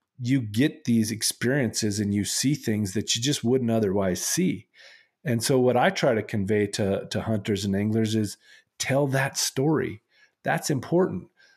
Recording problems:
none

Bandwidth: 14 kHz